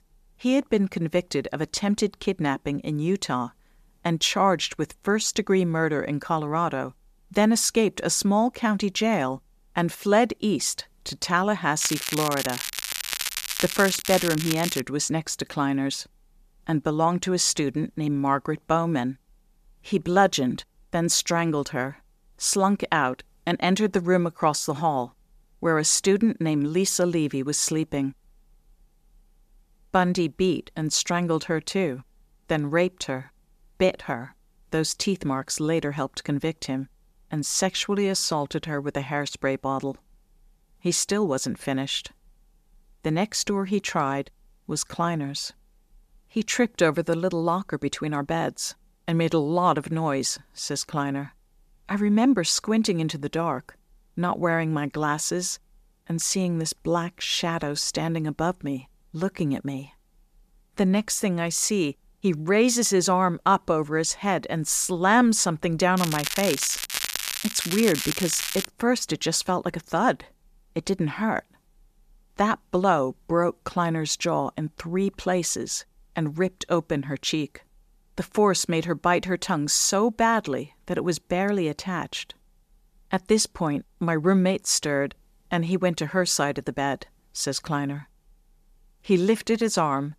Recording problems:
crackling; loud; from 12 to 15 s and from 1:06 to 1:09; 4 dB below the speech

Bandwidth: 14.5 kHz